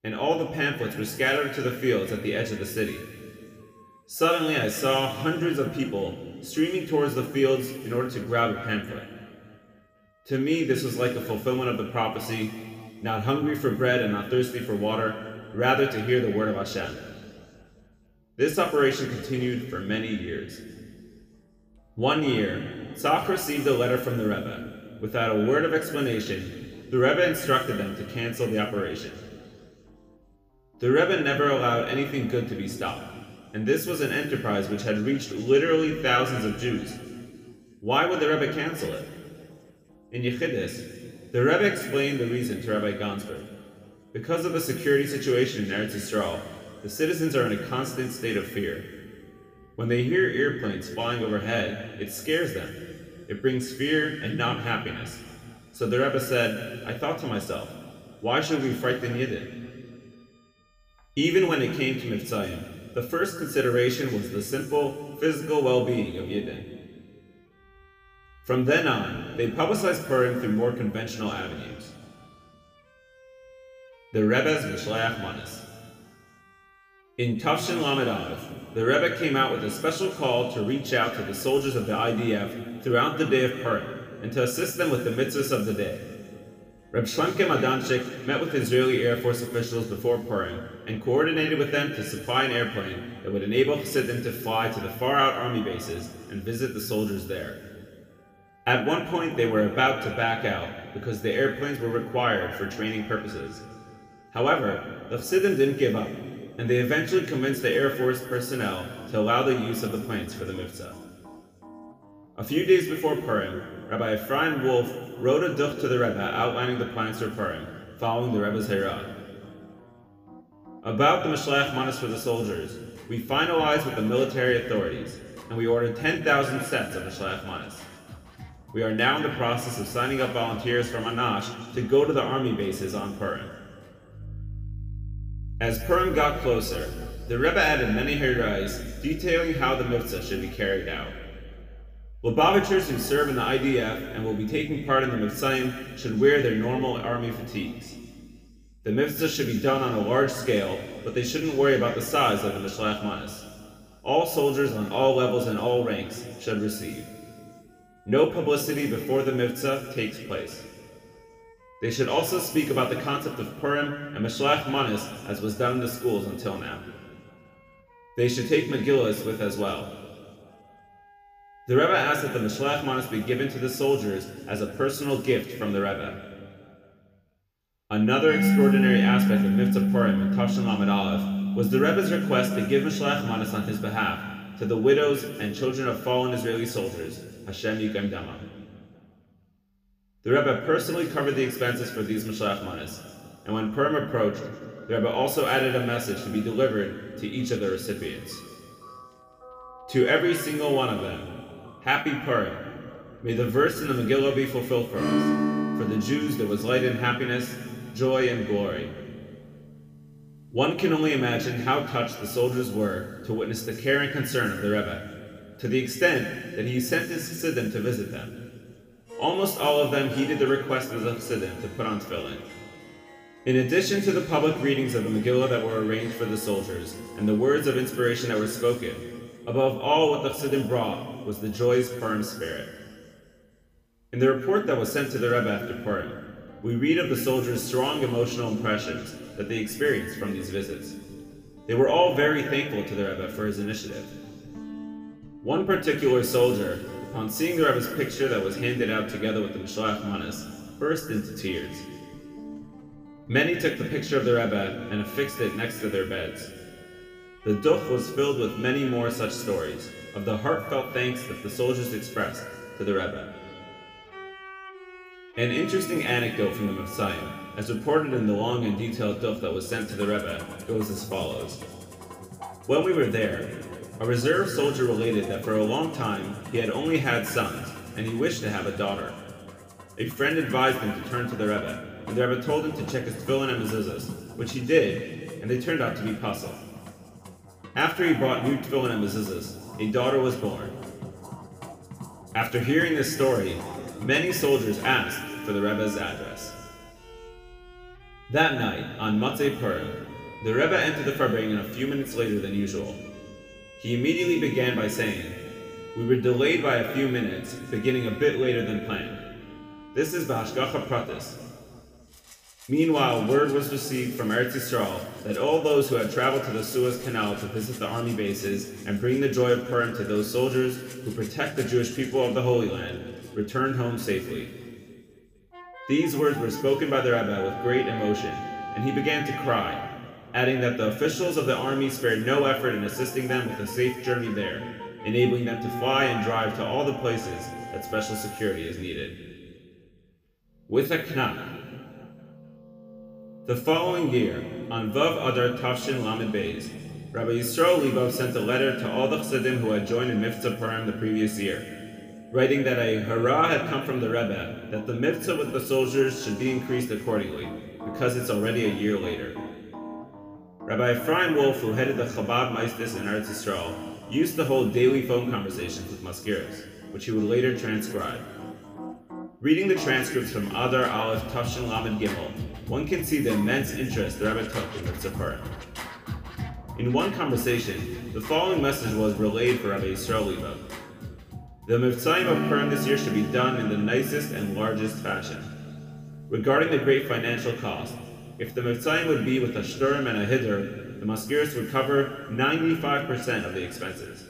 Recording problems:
room echo; noticeable; dies away in 2.2 s
off-mic speech; somewhat distant
background music; noticeable; throughout; 10 dB below the speech

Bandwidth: 15 kHz